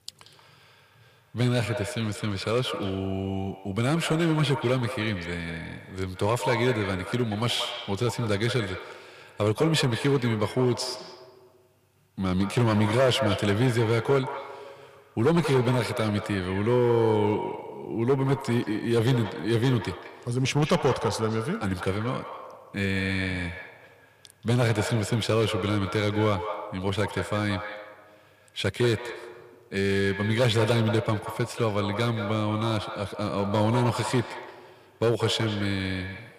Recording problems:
echo of what is said; strong; throughout; 180 ms later, 9 dB below the speech
distortion; slight; 3% of the sound clipped

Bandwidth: 15 kHz